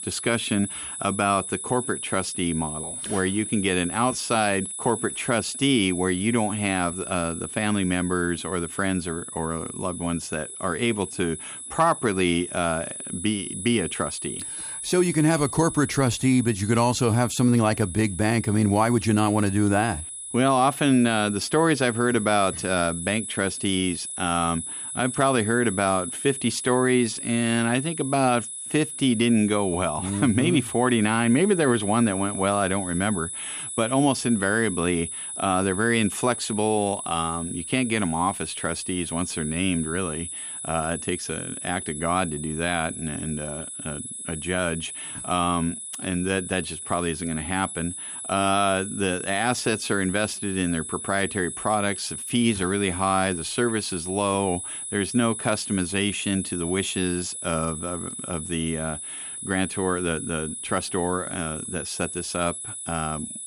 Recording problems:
high-pitched whine; loud; throughout; 10 kHz, 7 dB below the speech

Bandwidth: 14.5 kHz